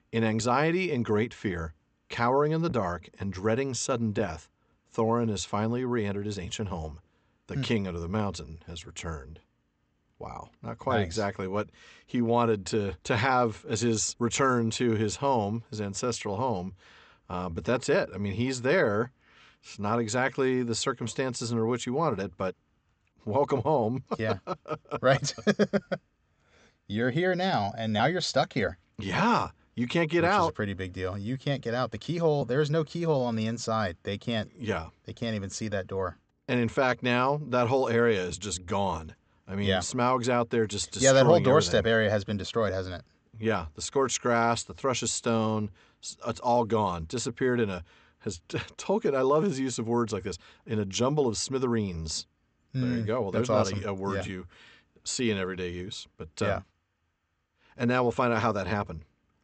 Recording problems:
high frequencies cut off; noticeable; nothing above 8 kHz

